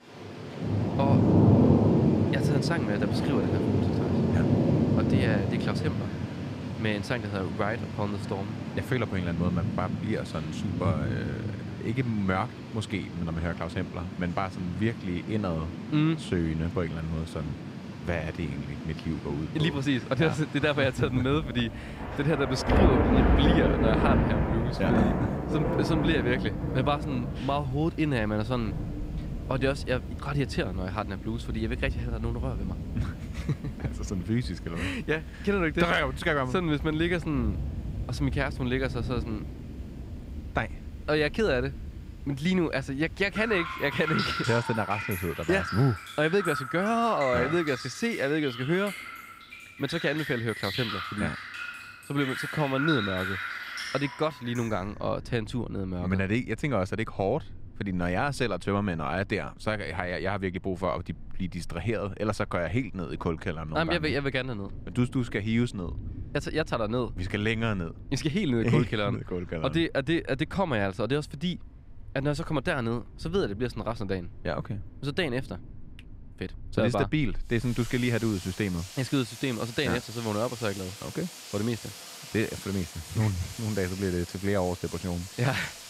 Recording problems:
rain or running water; loud; throughout; 2 dB below the speech

